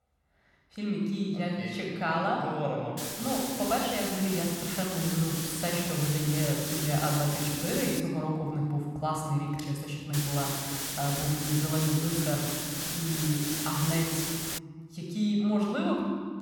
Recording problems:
room echo; noticeable; dies away in 1.7 s
off-mic speech; somewhat distant
hiss; loud; from 3 to 8 s and from 10 to 15 s; 2 dB below the speech

